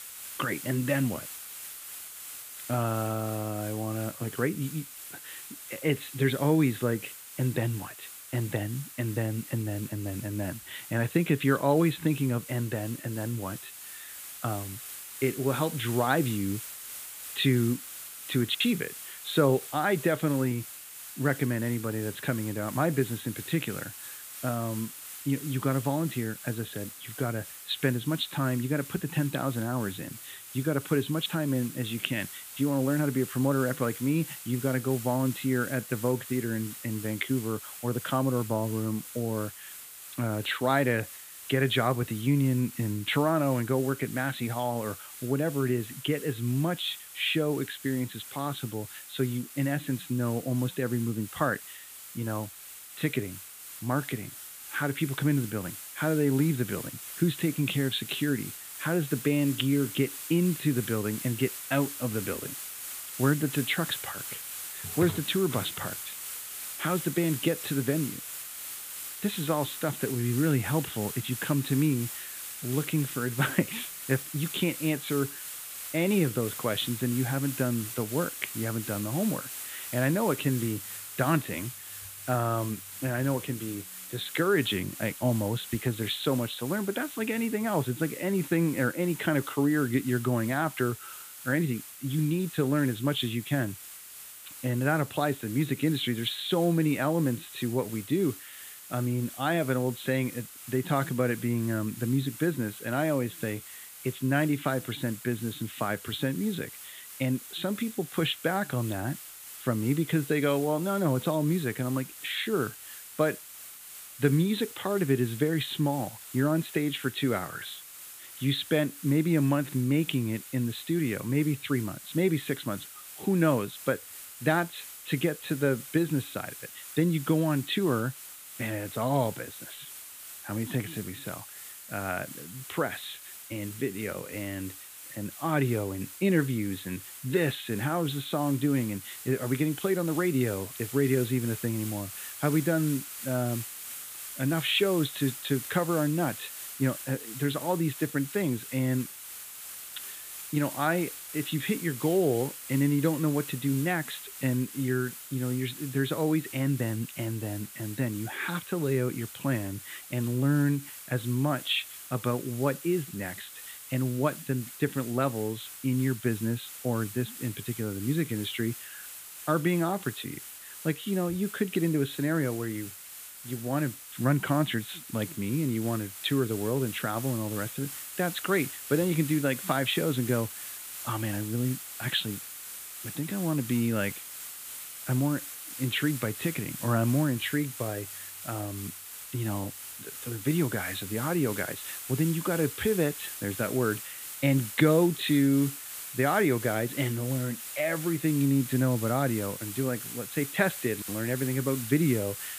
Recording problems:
high frequencies cut off; severe; nothing above 4 kHz
hiss; noticeable; throughout; 10 dB below the speech

